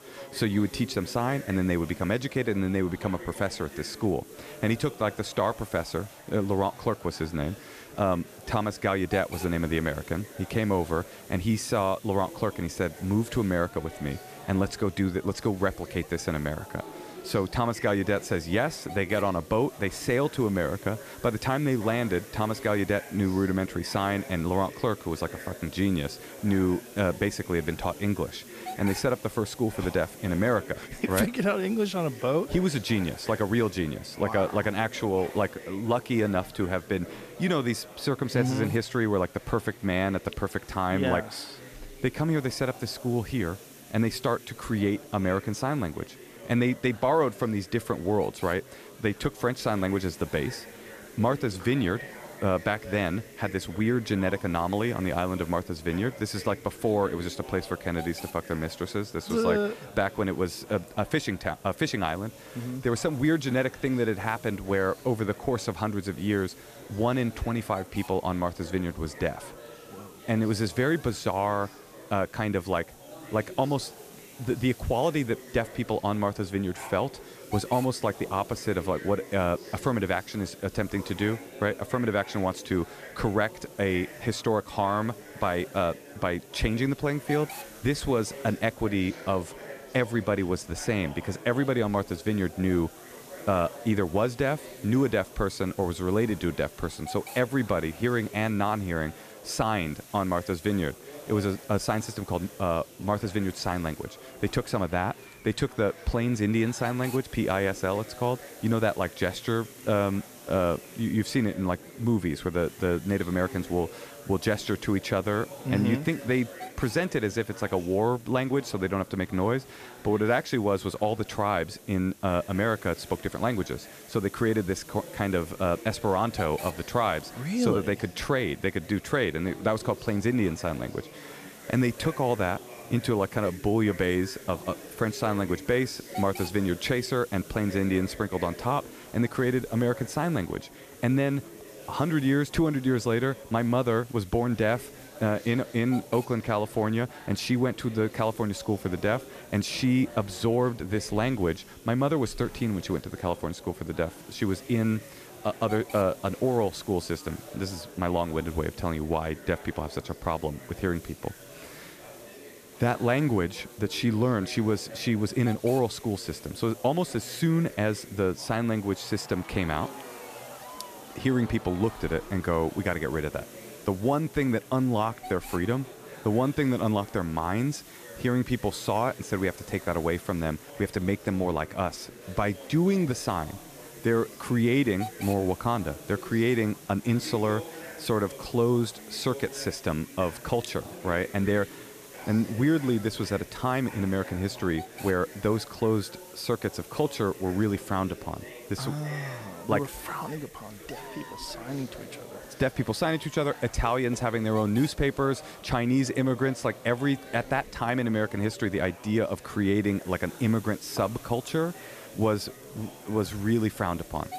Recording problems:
chatter from many people; noticeable; throughout; 20 dB below the speech
hiss; faint; throughout; 20 dB below the speech

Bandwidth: 14.5 kHz